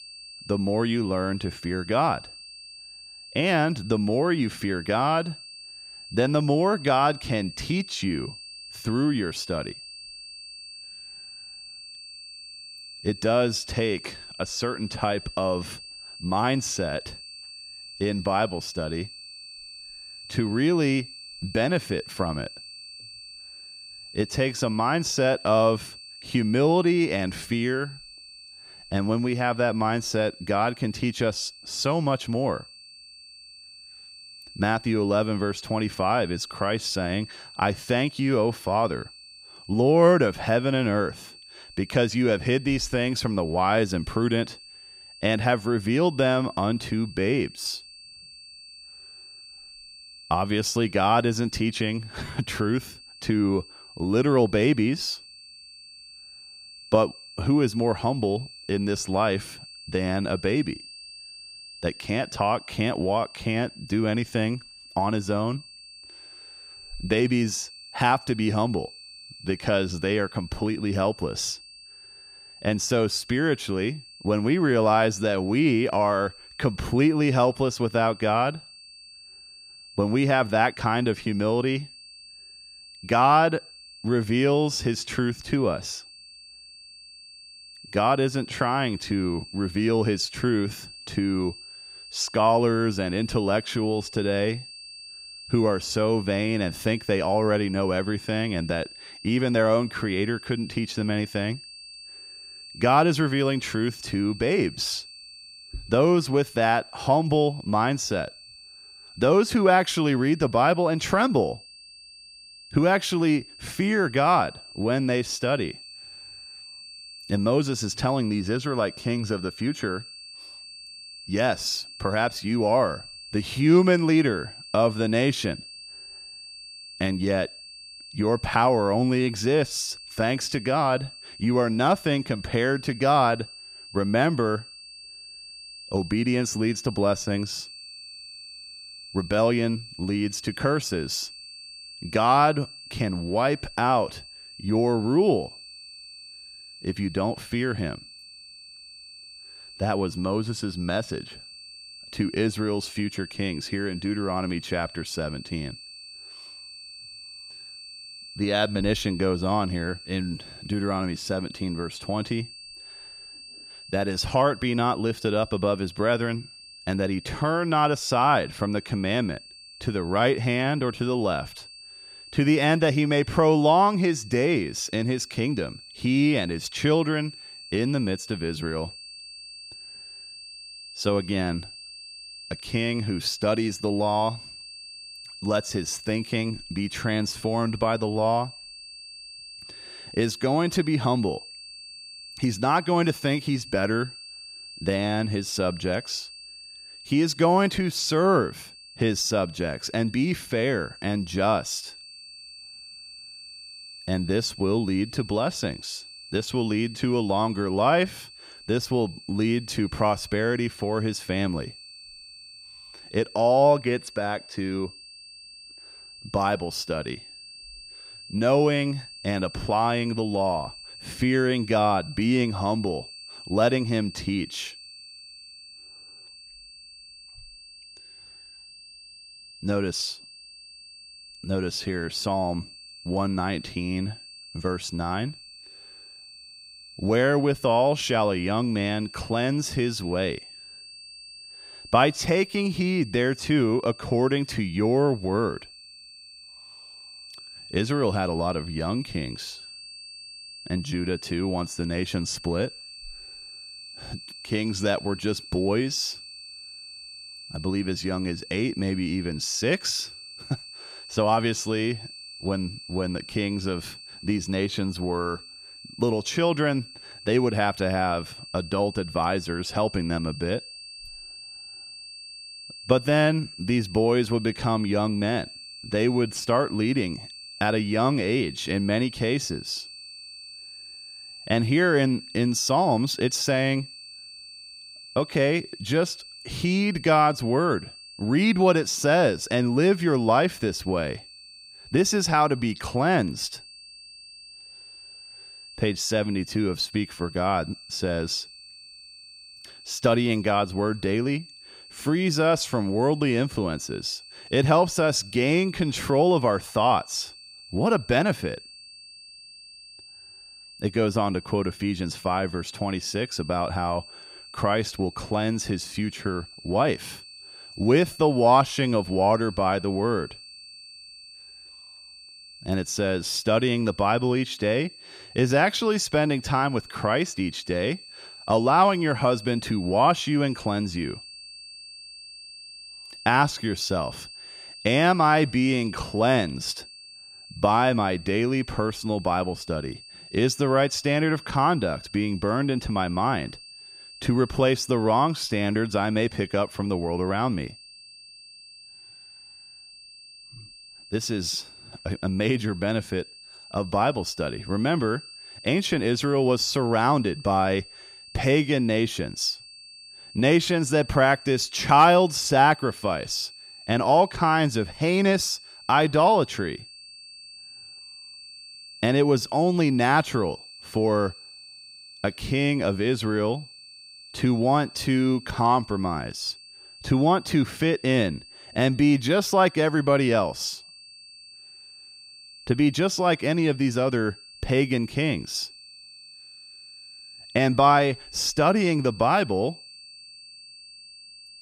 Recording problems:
high-pitched whine; noticeable; throughout; 4.5 kHz, 15 dB below the speech

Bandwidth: 15.5 kHz